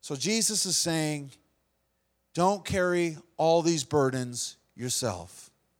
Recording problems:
none

